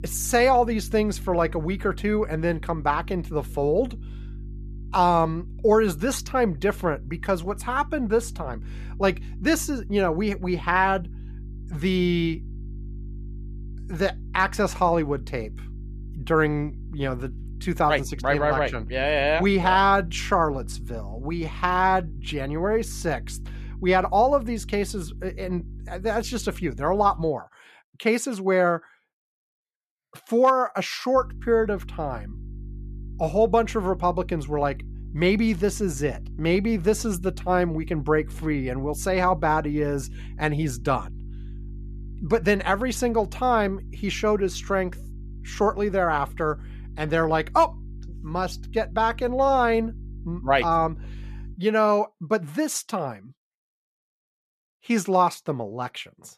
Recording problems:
electrical hum; faint; until 27 s and from 31 to 52 s; 50 Hz, 30 dB below the speech

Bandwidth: 14 kHz